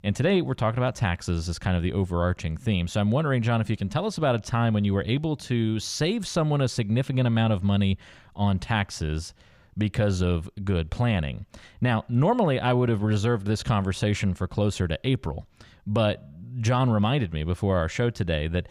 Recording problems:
none

